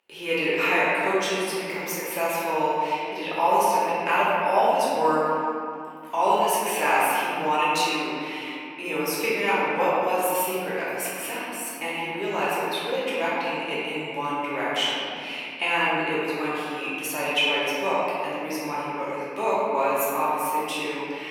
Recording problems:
room echo; strong; dies away in 2.5 s
off-mic speech; far
thin; very; fading below 600 Hz

